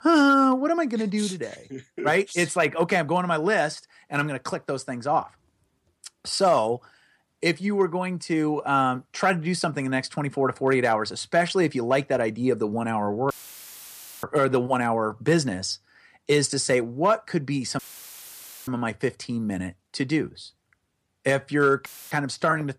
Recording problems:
audio cutting out; filled with static; at 13 s for 1 s, at 18 s for 1 s and at 22 s

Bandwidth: 14.5 kHz